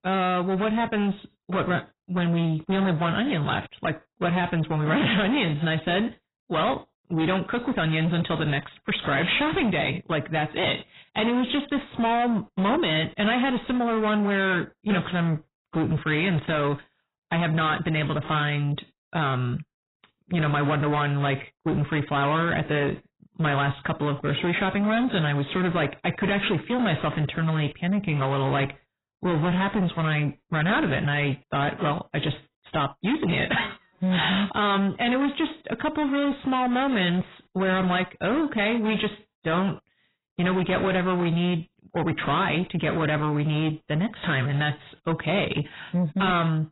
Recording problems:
distortion; heavy; 7 dB below the speech
garbled, watery; badly; nothing above 4 kHz

